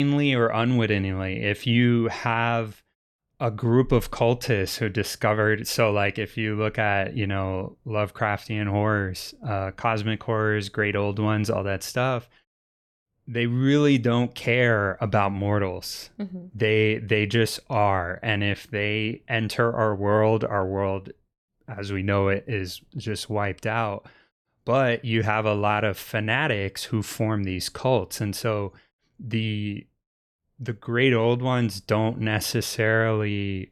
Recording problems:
abrupt cut into speech; at the start

